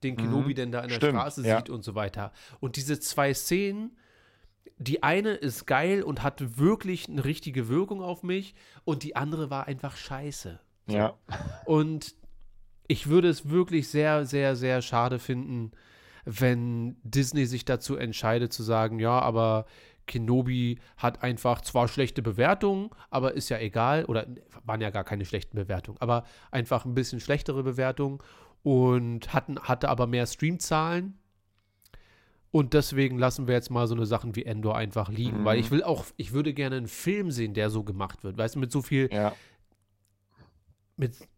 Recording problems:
none

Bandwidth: 16 kHz